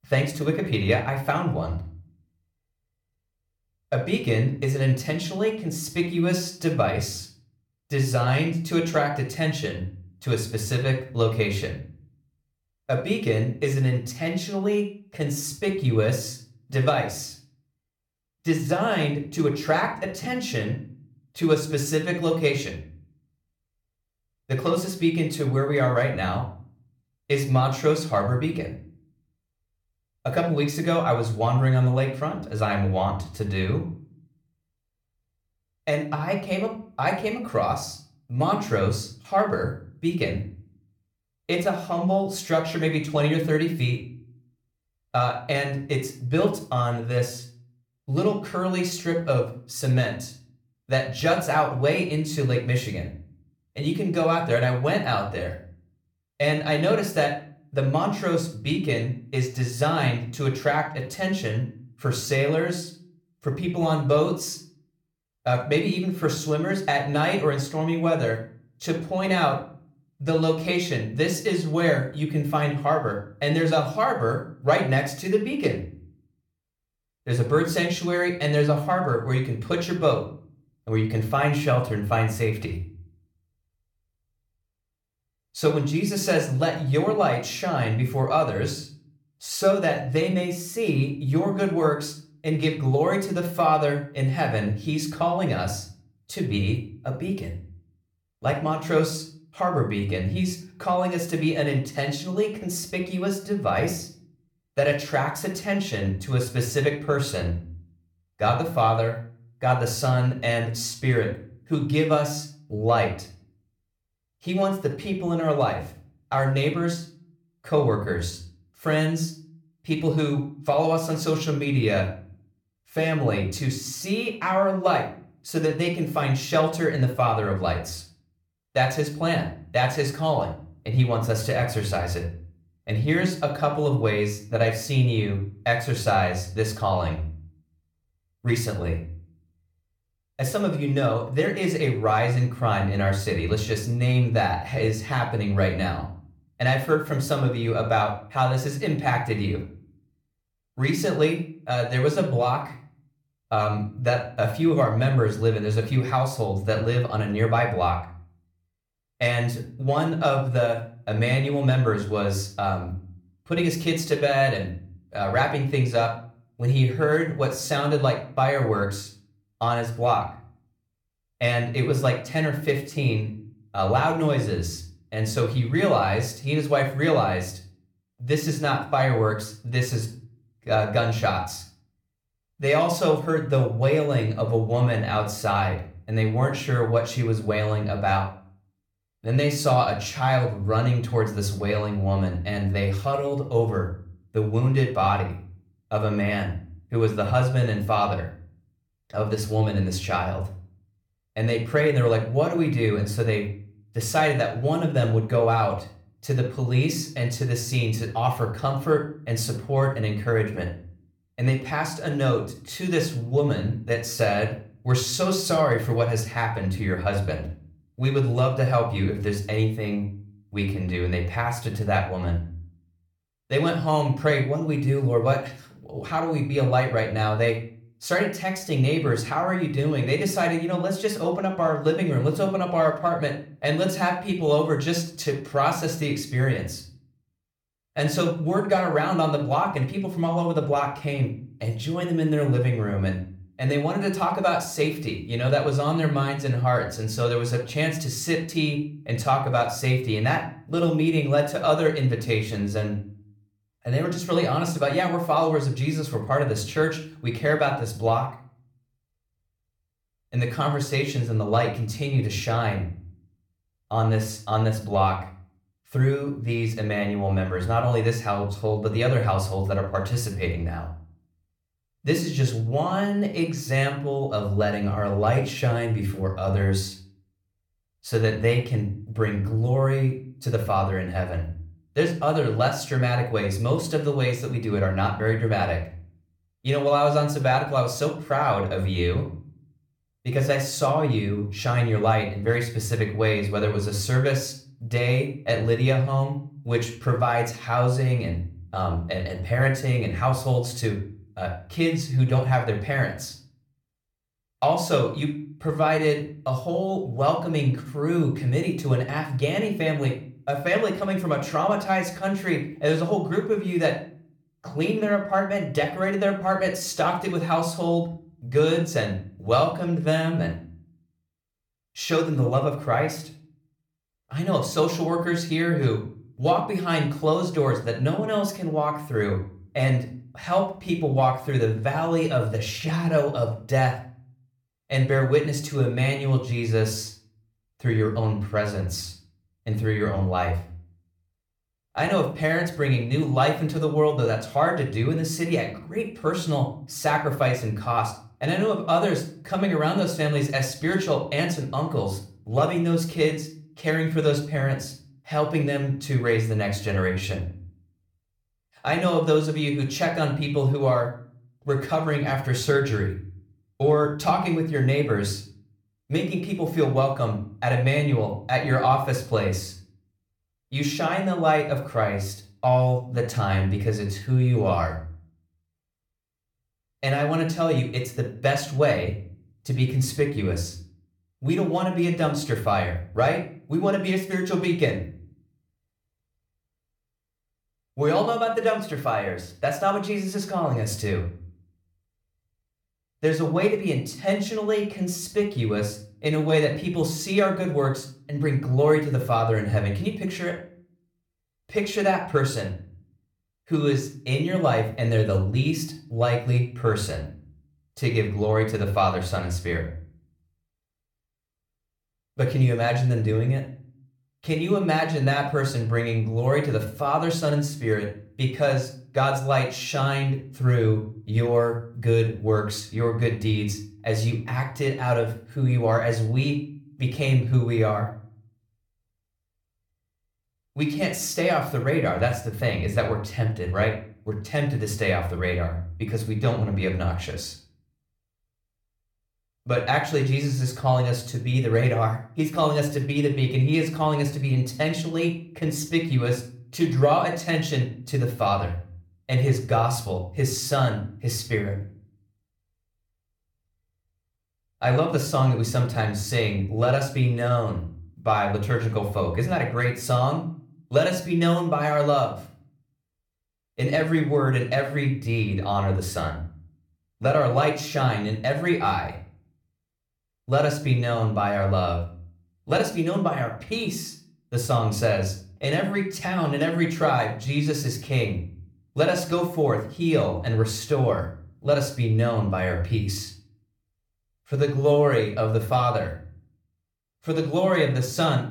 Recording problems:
room echo; slight; dies away in 0.4 s
off-mic speech; somewhat distant

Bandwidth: 19 kHz